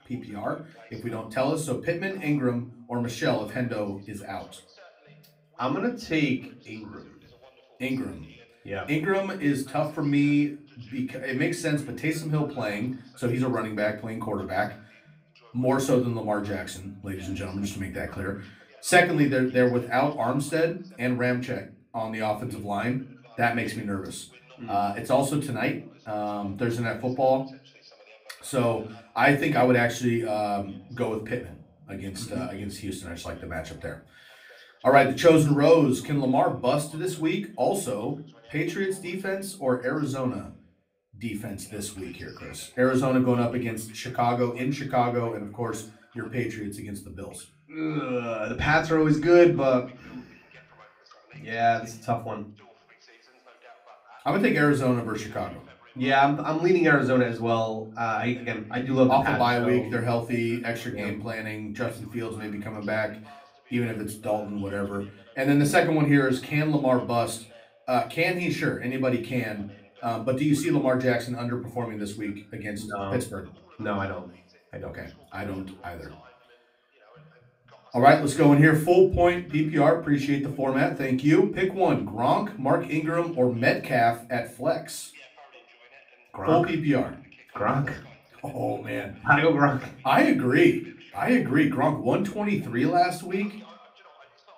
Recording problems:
off-mic speech; far
room echo; very slight; dies away in 0.3 s
voice in the background; faint; throughout; 30 dB below the speech

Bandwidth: 15.5 kHz